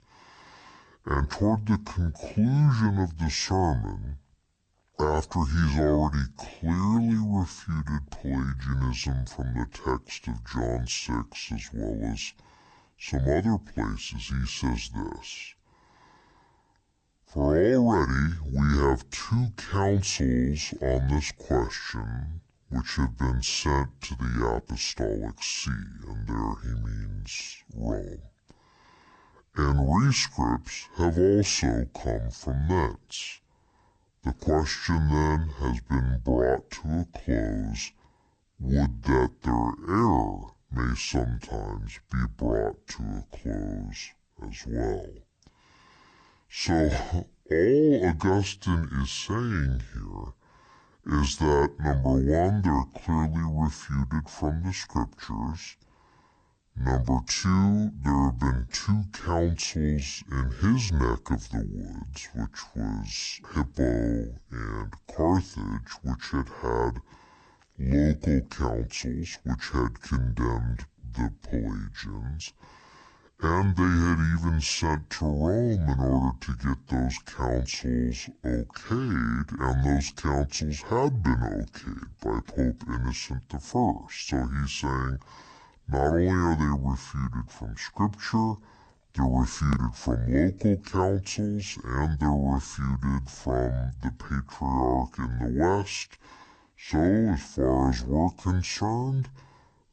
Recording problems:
wrong speed and pitch; too slow and too low; 0.6 times normal speed

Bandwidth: 8.5 kHz